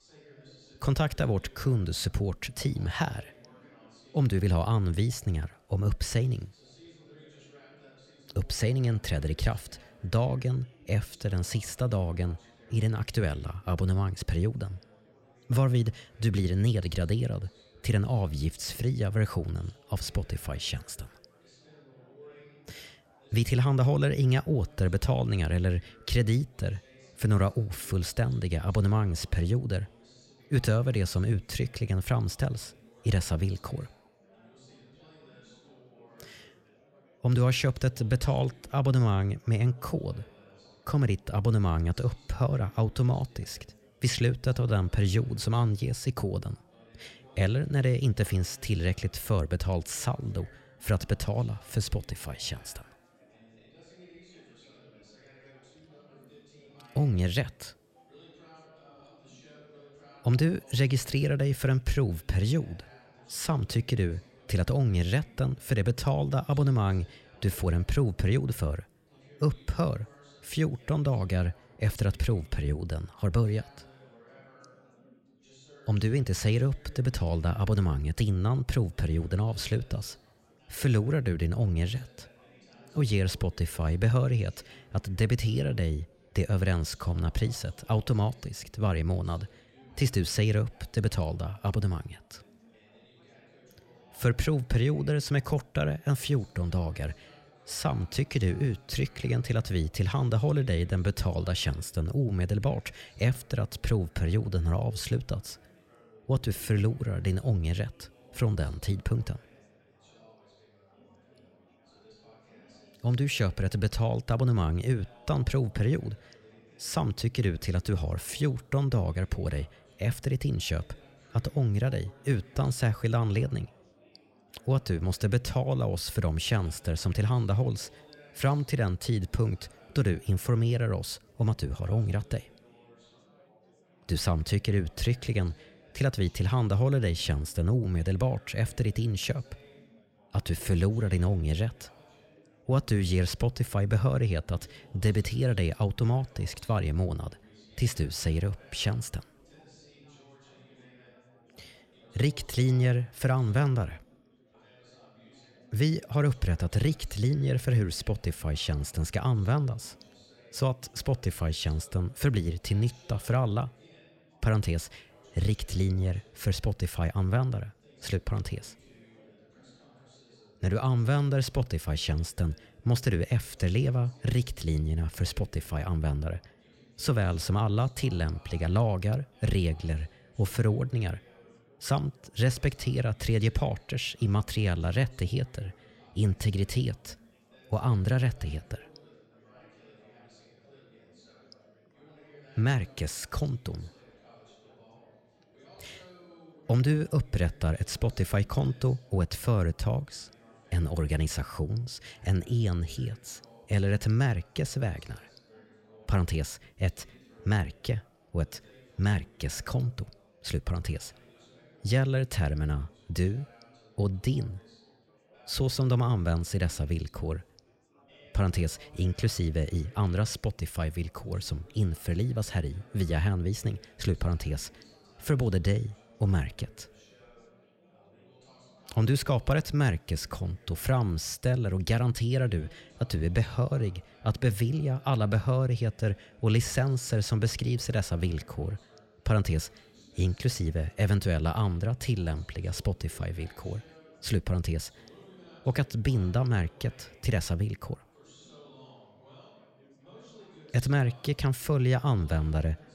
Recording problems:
chatter from many people; faint; throughout; 30 dB below the speech

